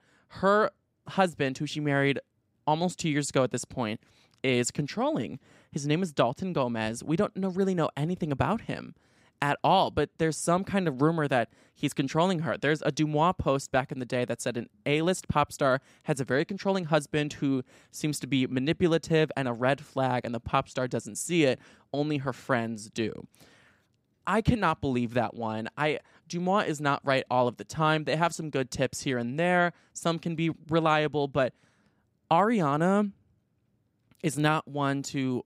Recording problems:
none

